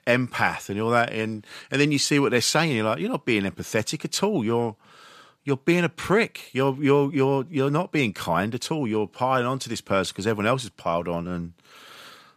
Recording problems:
none

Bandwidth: 14.5 kHz